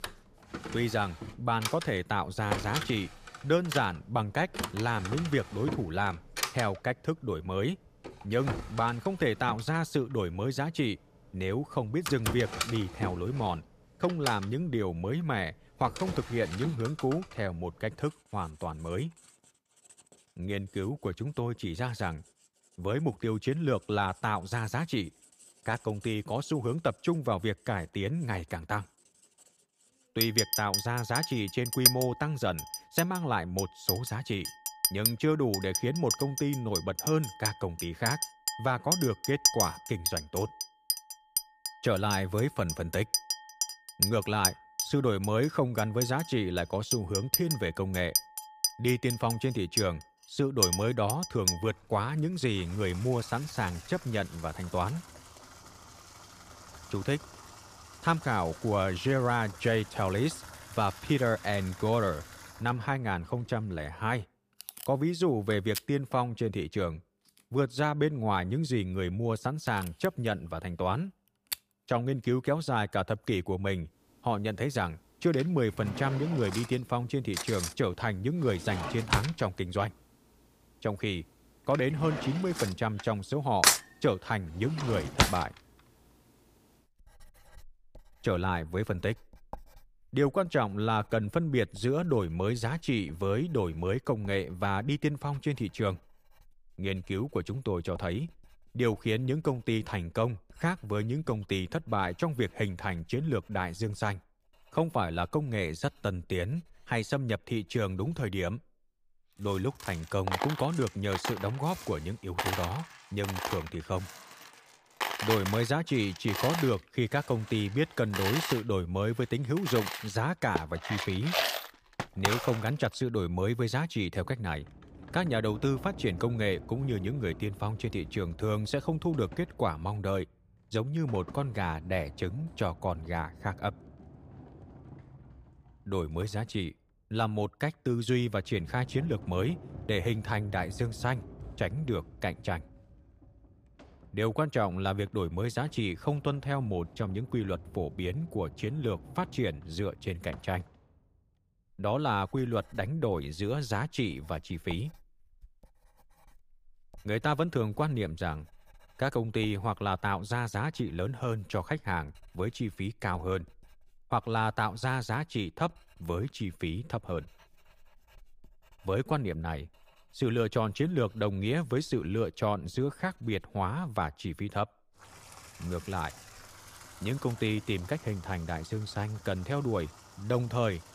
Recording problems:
household noises; loud; throughout; 3 dB below the speech

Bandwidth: 15 kHz